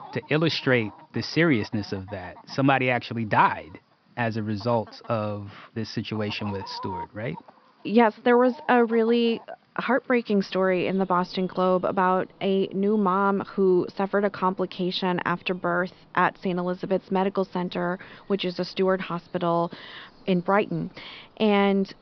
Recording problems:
high frequencies cut off; noticeable; nothing above 5.5 kHz
animal sounds; faint; throughout; 25 dB below the speech

